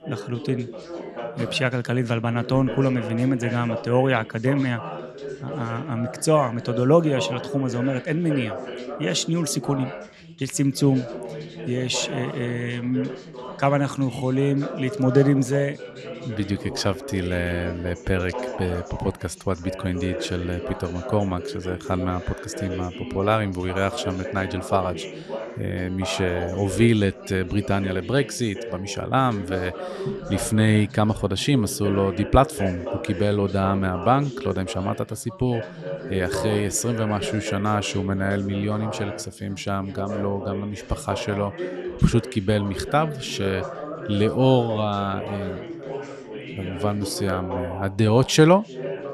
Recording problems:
background chatter; loud; throughout; 3 voices, 10 dB below the speech

